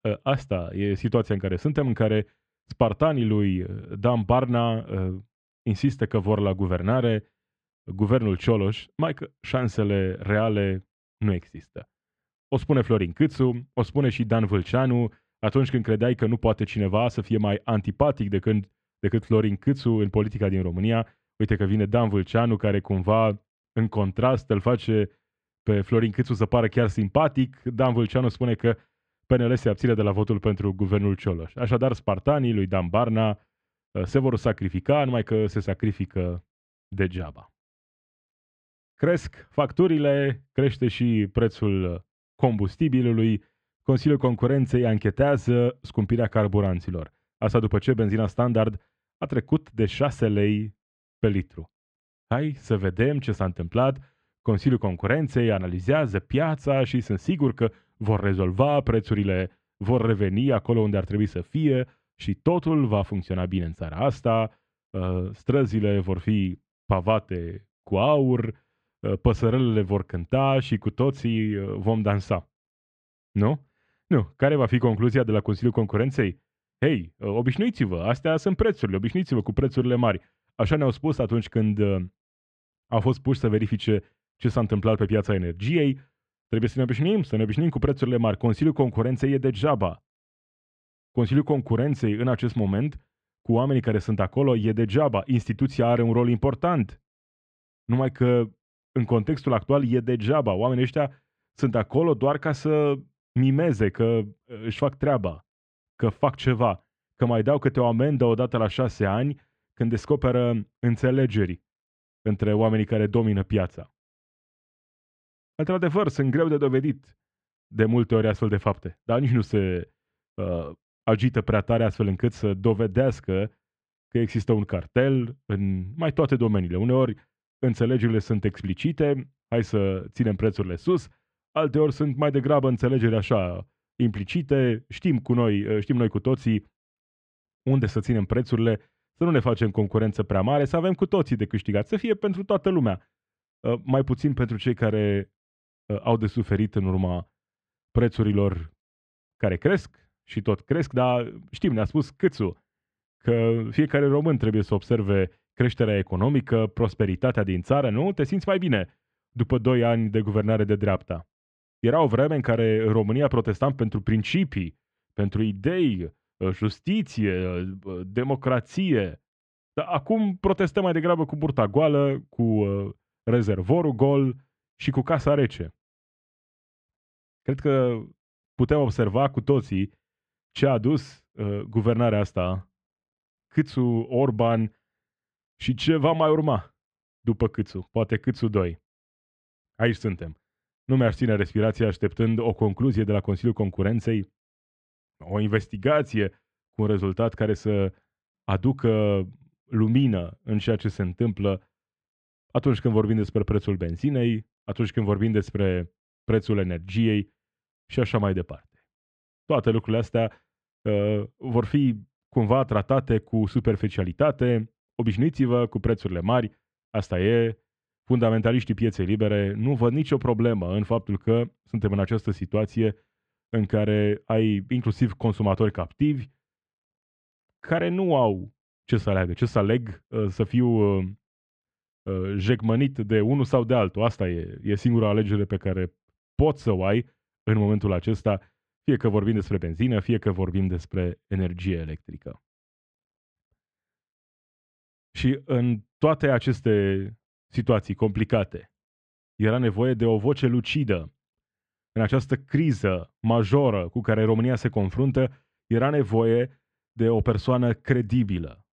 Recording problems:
muffled; very; fading above 2.5 kHz

